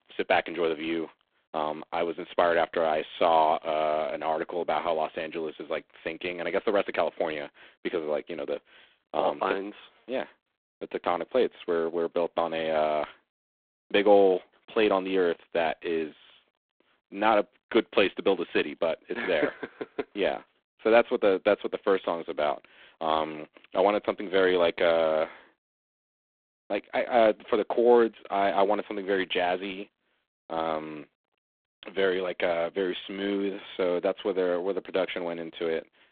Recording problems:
phone-call audio; poor line; nothing above 3.5 kHz

